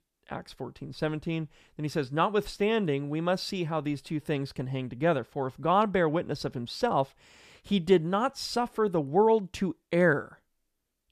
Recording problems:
none

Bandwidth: 14.5 kHz